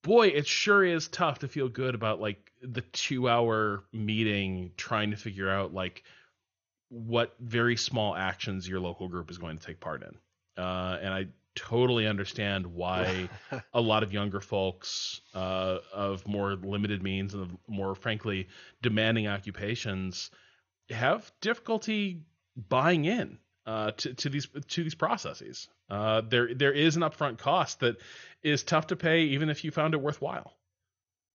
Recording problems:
garbled, watery; slightly; nothing above 6.5 kHz

